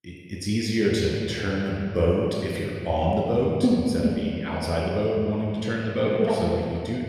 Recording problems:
echo of what is said; noticeable; throughout; 120 ms later, 15 dB below the speech
room echo; noticeable; dies away in 2.2 s
off-mic speech; somewhat distant

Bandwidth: 14.5 kHz